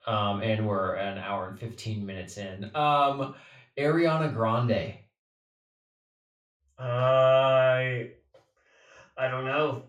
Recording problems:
room echo; slight; dies away in 0.3 s
off-mic speech; somewhat distant

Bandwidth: 16 kHz